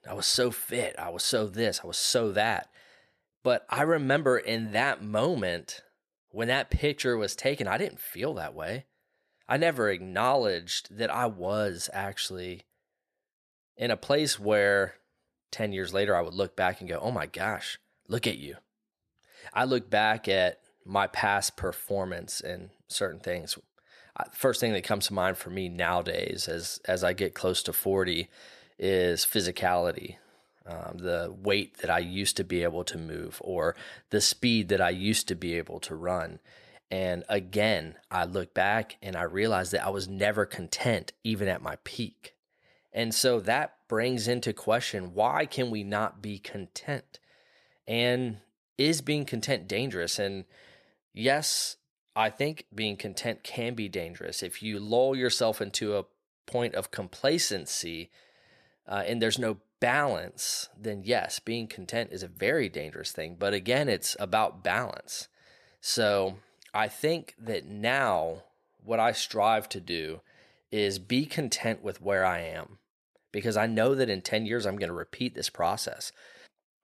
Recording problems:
none

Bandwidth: 14.5 kHz